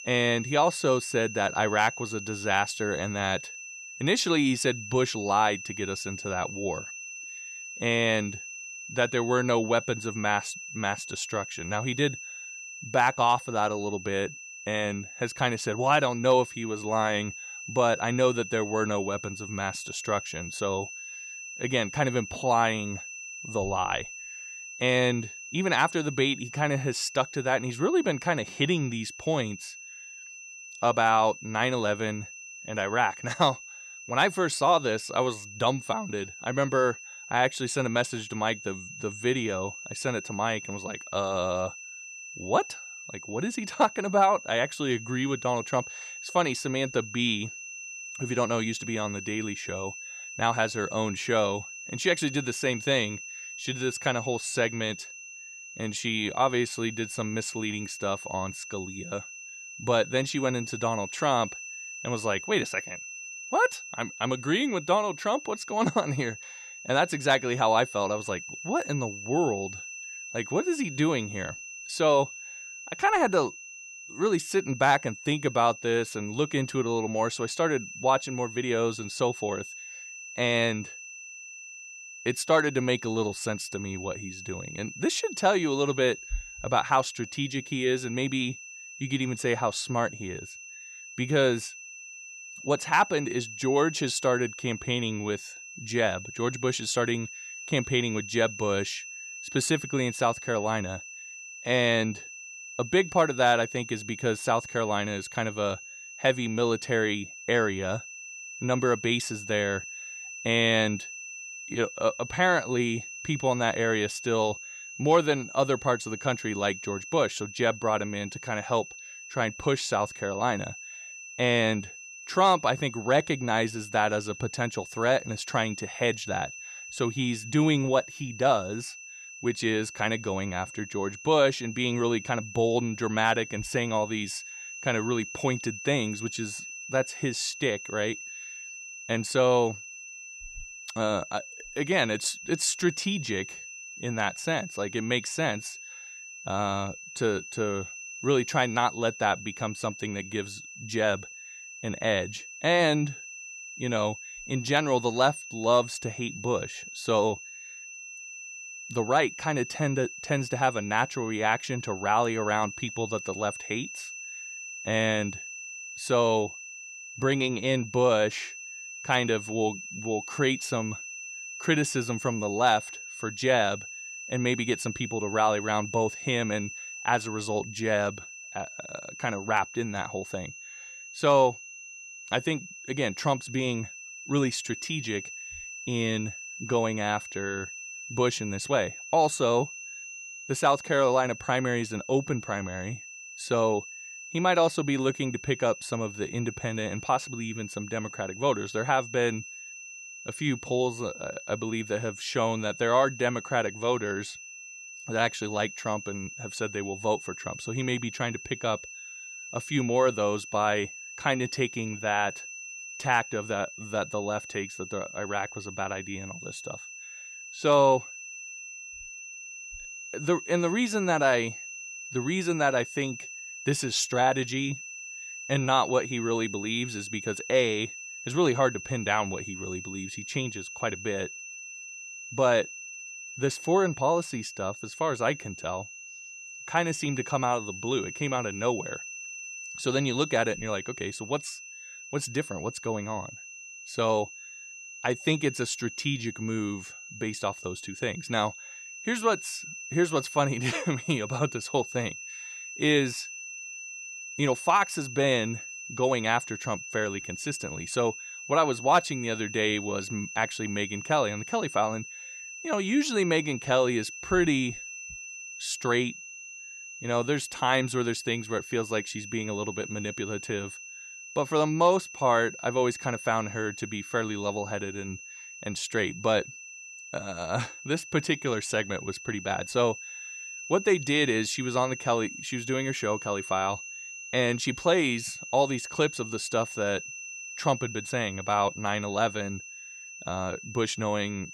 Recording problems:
high-pitched whine; noticeable; throughout; 2.5 kHz, 10 dB below the speech

